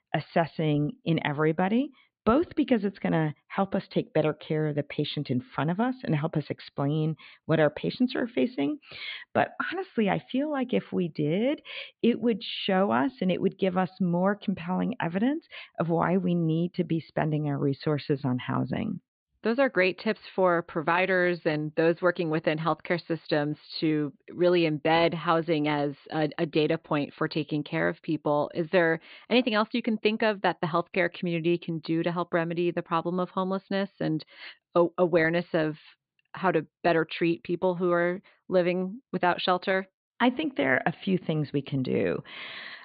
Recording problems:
high frequencies cut off; severe; nothing above 4.5 kHz

